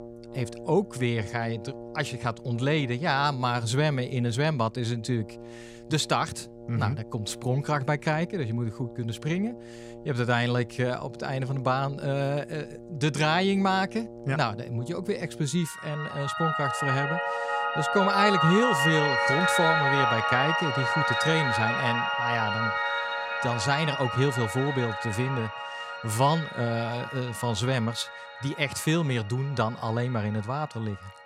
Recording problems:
background music; very loud; throughout; as loud as the speech

